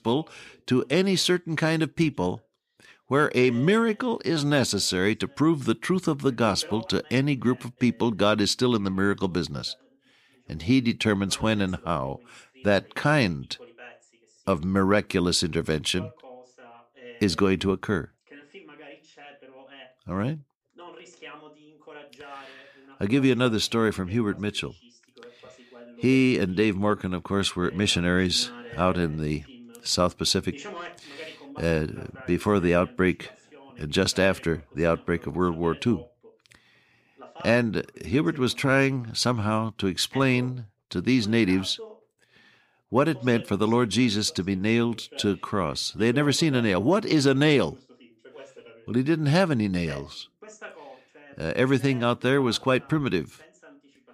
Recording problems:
voice in the background; faint; throughout; 25 dB below the speech

